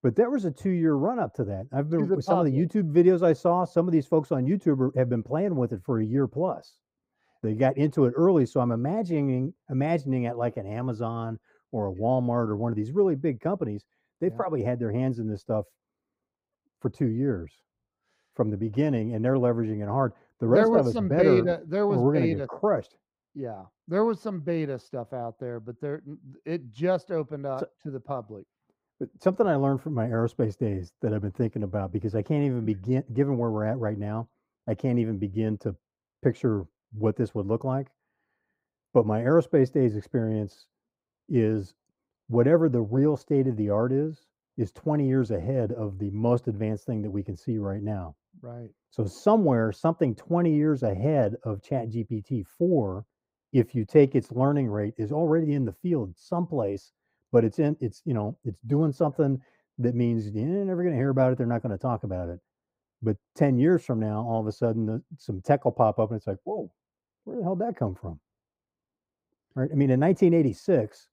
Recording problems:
muffled; very; fading above 1.5 kHz

